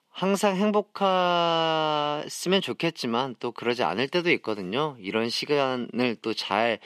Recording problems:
thin; very slightly; fading below 250 Hz

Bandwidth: 14.5 kHz